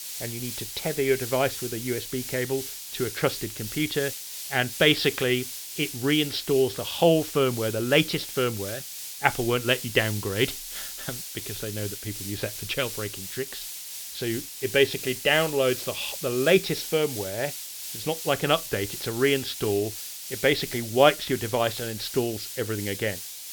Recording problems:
high frequencies cut off; noticeable; nothing above 6 kHz
hiss; loud; throughout; 8 dB below the speech

